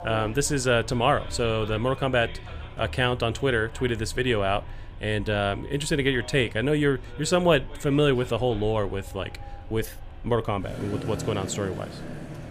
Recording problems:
traffic noise; noticeable; throughout; 15 dB below the speech

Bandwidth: 15 kHz